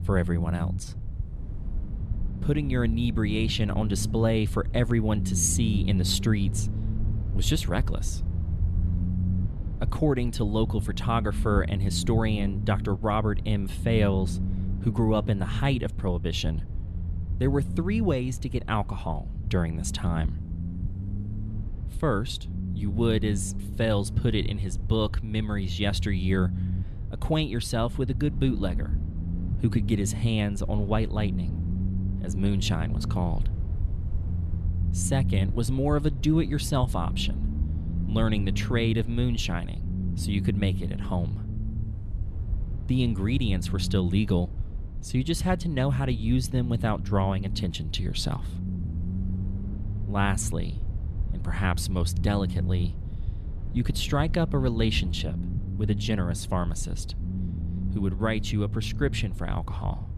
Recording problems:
low rumble; noticeable; throughout; 15 dB below the speech

